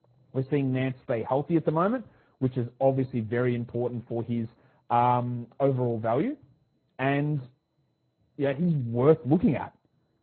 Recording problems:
garbled, watery; badly; nothing above 4 kHz
muffled; very slightly; fading above 1.5 kHz

